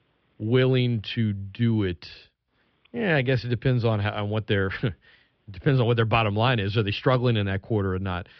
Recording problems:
high frequencies cut off; noticeable; nothing above 5.5 kHz

